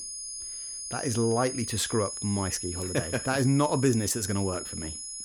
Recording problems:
high-pitched whine; loud; throughout; 10 kHz, 7 dB below the speech

